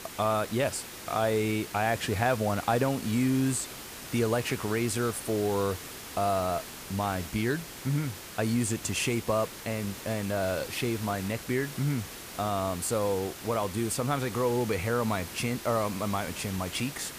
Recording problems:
hiss; noticeable; throughout; 10 dB below the speech

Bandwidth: 15 kHz